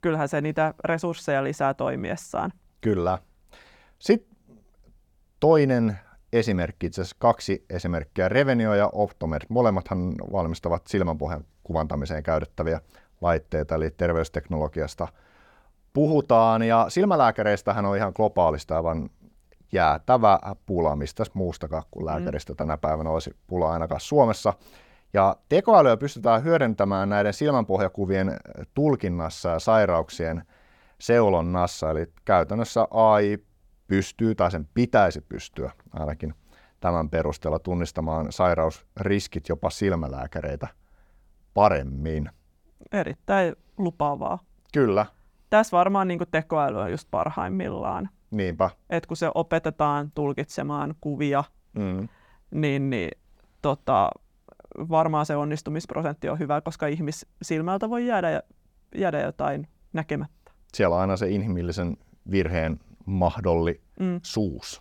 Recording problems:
none

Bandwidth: 18 kHz